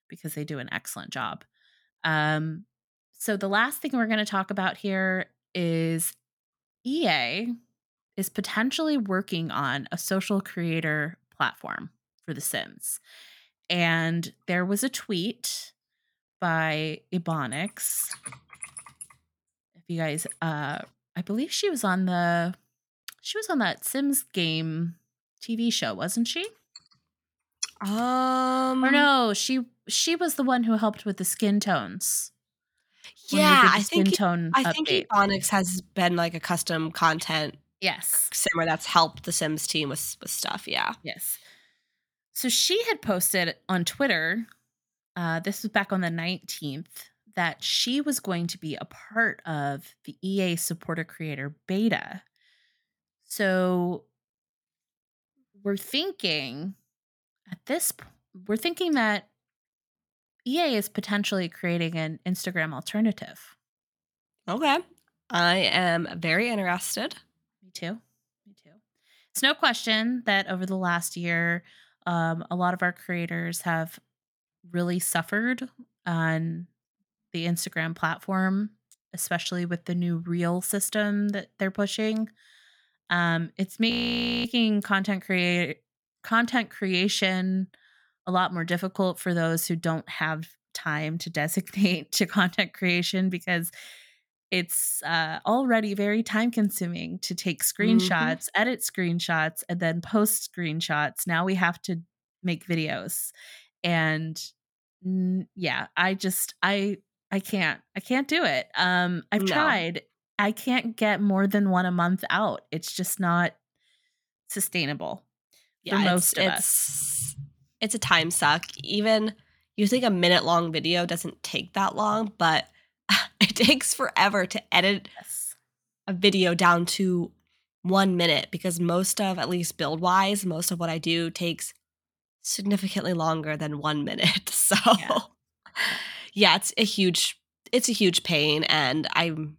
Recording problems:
audio freezing; at 1:24 for 0.5 s

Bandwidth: 18.5 kHz